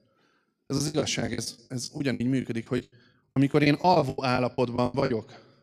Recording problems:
choppy; very; 21% of the speech affected

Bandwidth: 14.5 kHz